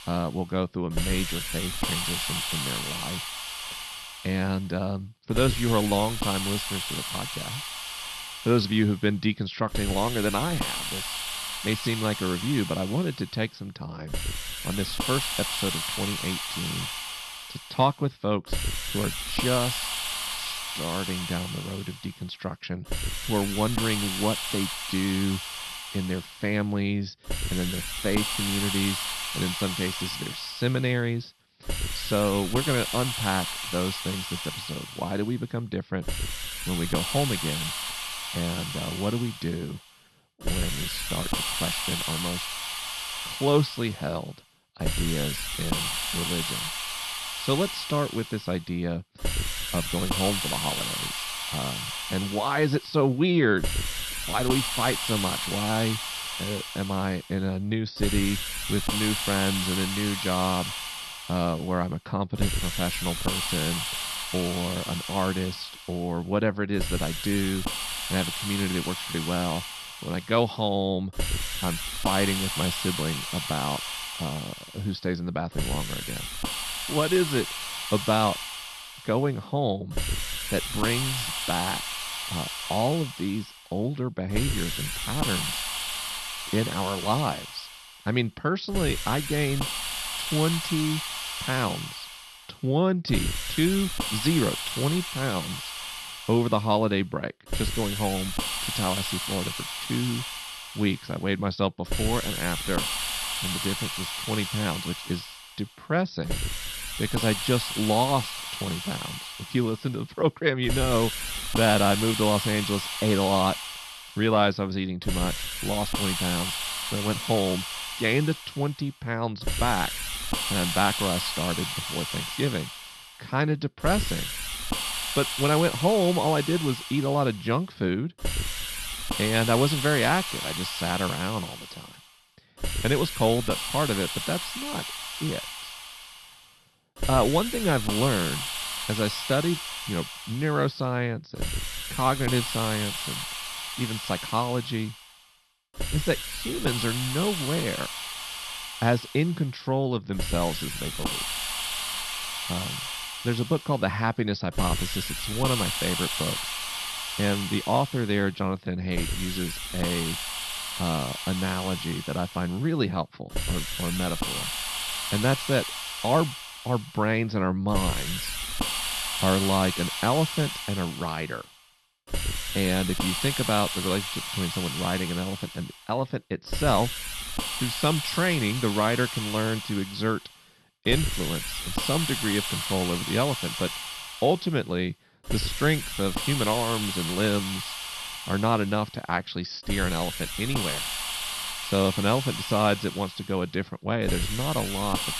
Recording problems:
high frequencies cut off; noticeable; nothing above 5.5 kHz
hiss; loud; throughout; 3 dB below the speech

